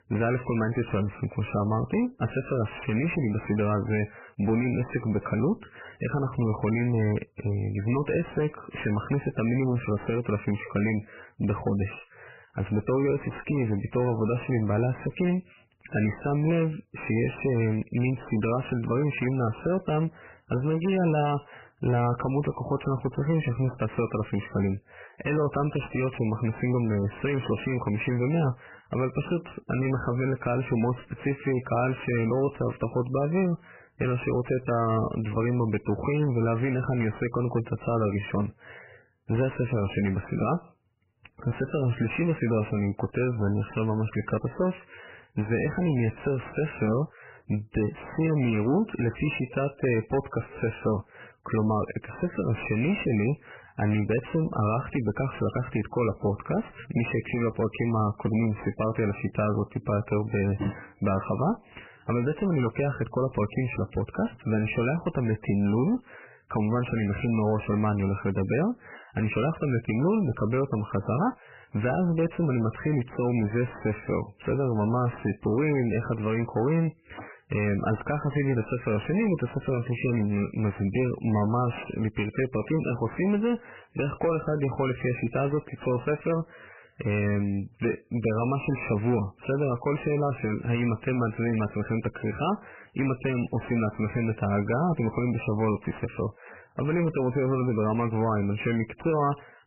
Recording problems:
garbled, watery; badly; nothing above 3 kHz
distortion; slight; 9 dB below the speech

